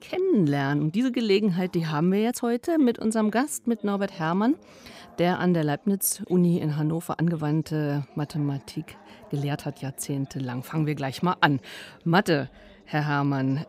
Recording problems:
background chatter; faint; throughout; 3 voices, 25 dB below the speech
uneven, jittery; strongly; from 0.5 to 10 s

